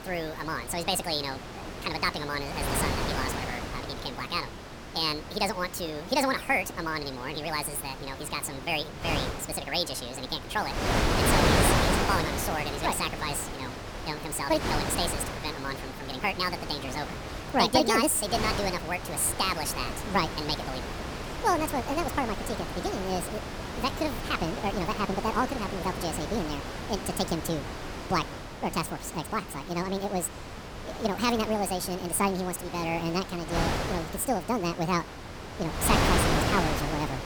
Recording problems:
wrong speed and pitch; too fast and too high; 1.7 times normal speed
wind noise on the microphone; heavy; 4 dB below the speech
chatter from many people; faint; throughout; 30 dB below the speech

